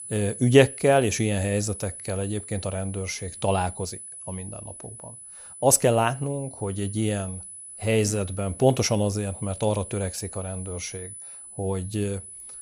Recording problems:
high-pitched whine; noticeable; throughout; 10 kHz, 15 dB below the speech

